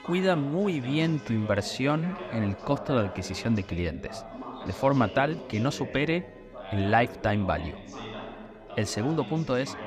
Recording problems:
background chatter; noticeable; throughout; 3 voices, 10 dB below the speech
alarms or sirens; faint; throughout; 30 dB below the speech

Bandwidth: 14.5 kHz